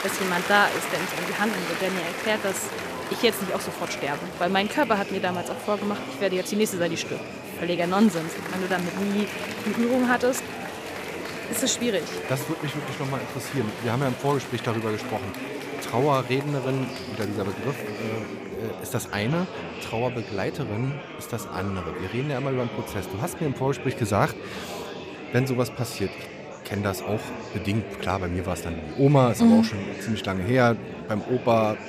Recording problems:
murmuring crowd; loud; throughout; 7 dB below the speech

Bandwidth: 14.5 kHz